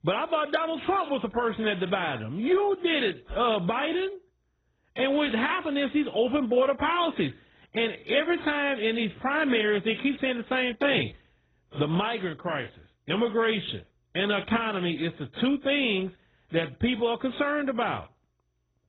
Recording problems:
garbled, watery; badly; nothing above 3.5 kHz

